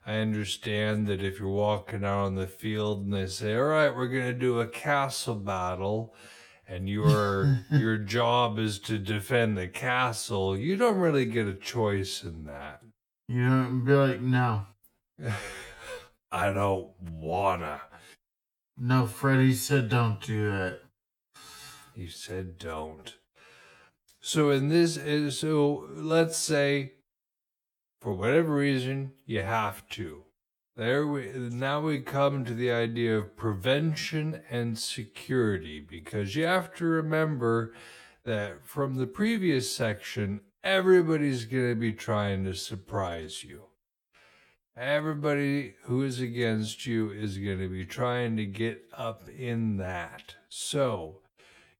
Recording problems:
wrong speed, natural pitch; too slow; 0.6 times normal speed

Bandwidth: 18.5 kHz